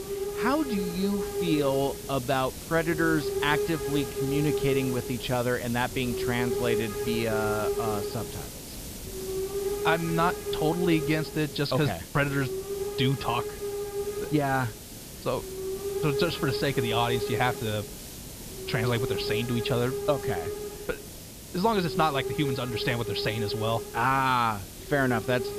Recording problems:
high frequencies cut off; noticeable; nothing above 5.5 kHz
hiss; loud; throughout; 5 dB below the speech

